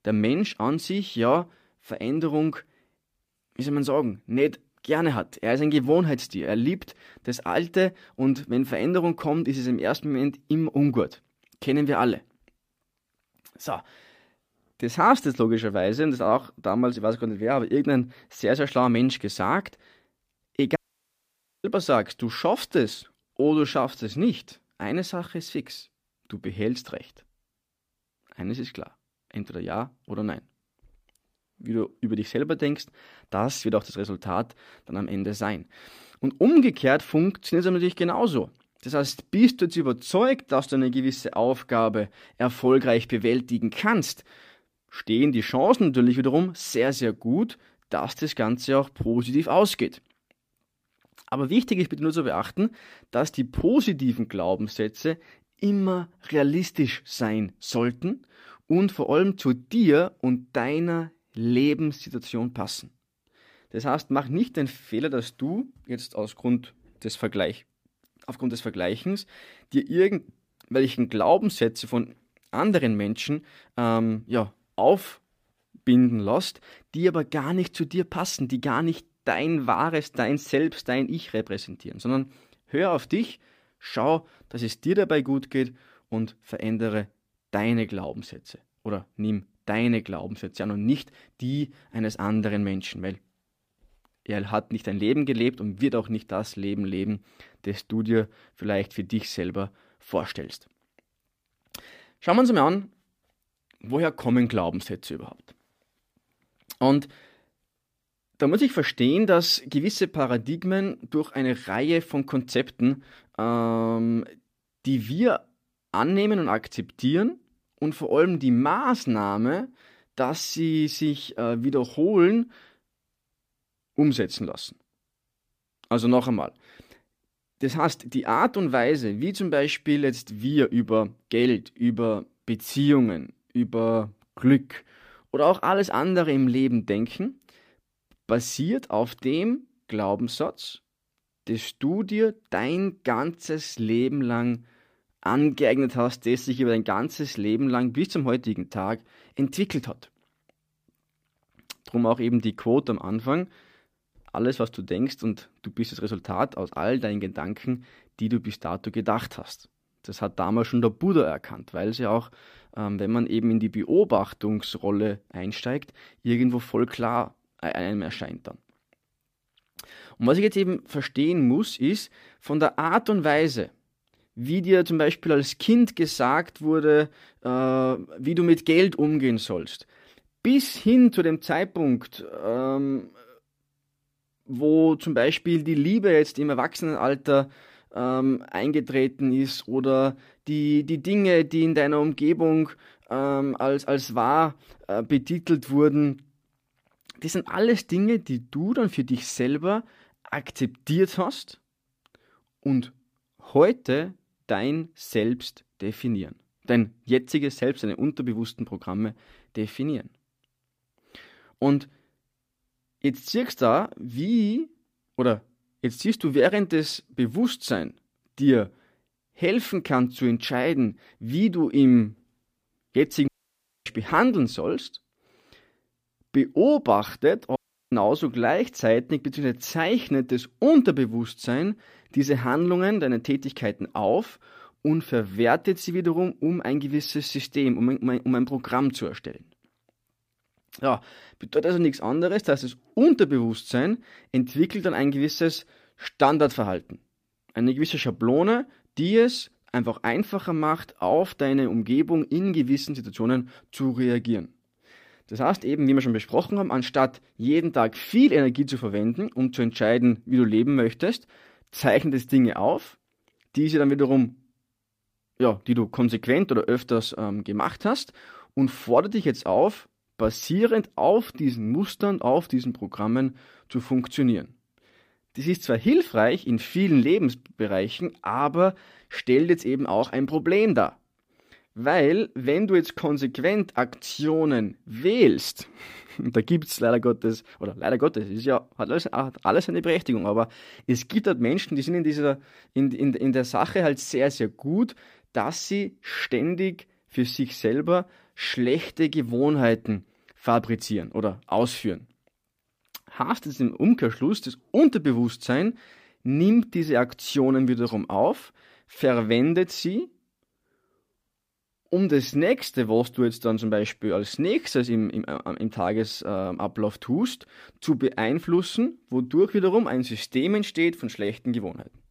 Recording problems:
audio cutting out; at 21 s for 1 s, at 3:43 for 0.5 s and at 3:48

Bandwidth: 15 kHz